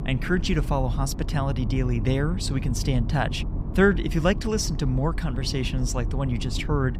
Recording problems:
low rumble; noticeable; throughout; 15 dB below the speech

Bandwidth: 15.5 kHz